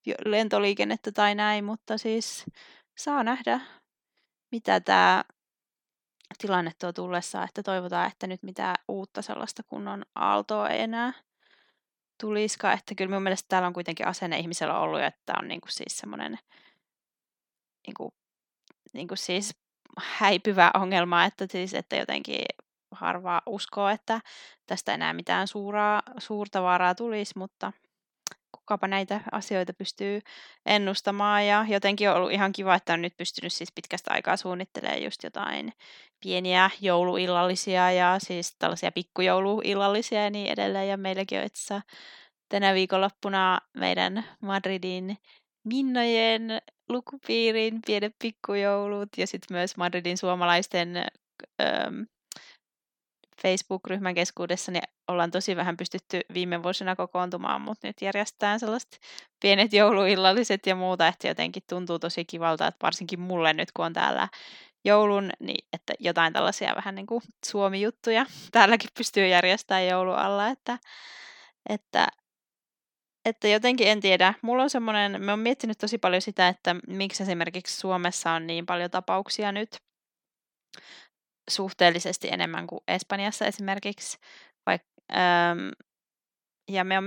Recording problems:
abrupt cut into speech; at the end

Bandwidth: 17 kHz